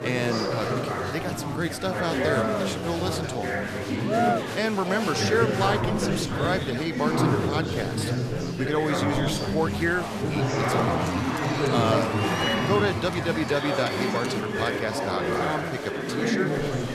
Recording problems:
chatter from many people; very loud; throughout; 2 dB above the speech

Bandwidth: 14 kHz